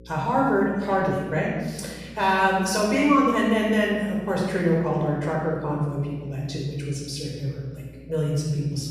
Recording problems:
room echo; strong; dies away in 1.4 s
off-mic speech; far
electrical hum; faint; throughout; 60 Hz, 30 dB below the speech

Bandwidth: 14.5 kHz